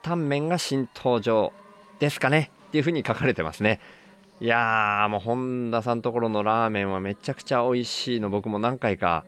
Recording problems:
chatter from many people; faint; throughout; 30 dB below the speech

